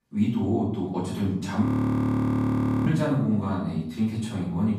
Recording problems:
off-mic speech; far
room echo; noticeable; dies away in 0.7 s
audio freezing; at 1.5 s for 1 s

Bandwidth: 15 kHz